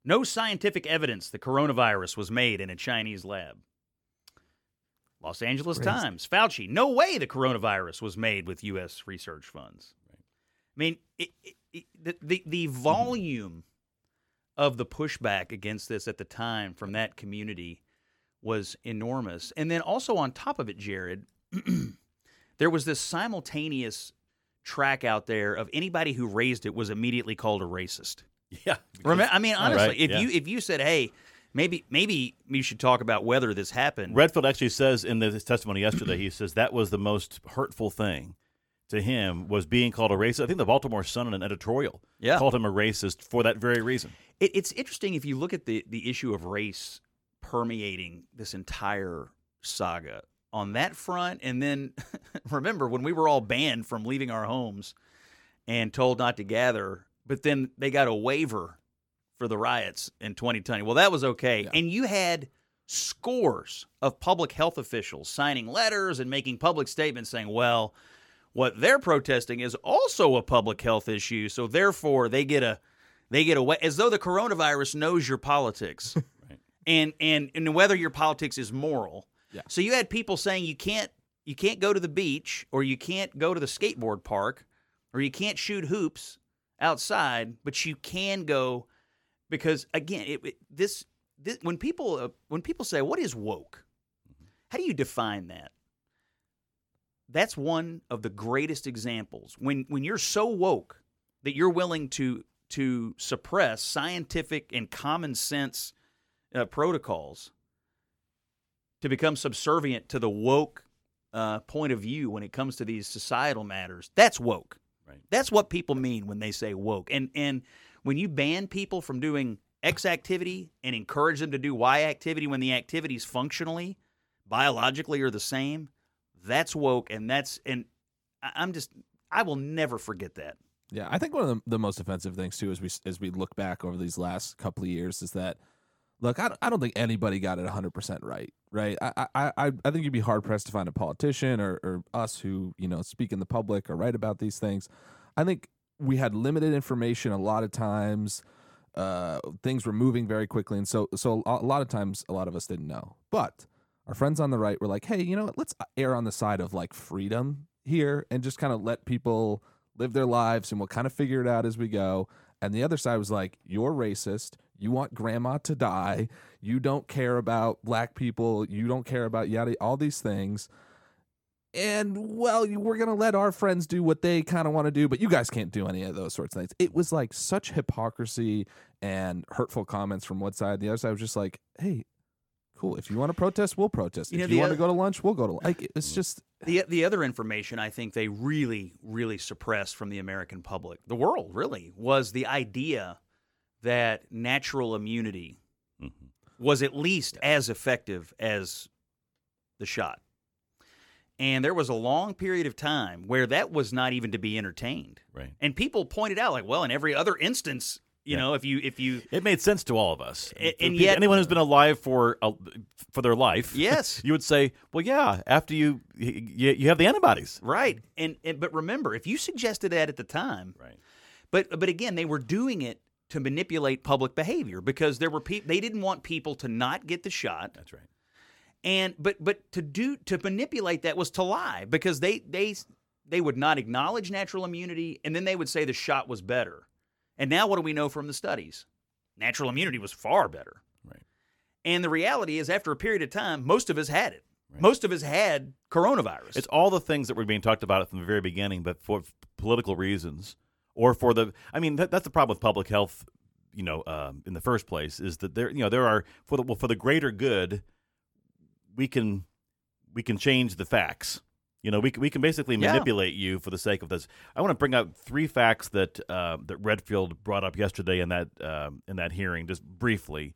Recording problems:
none

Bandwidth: 17.5 kHz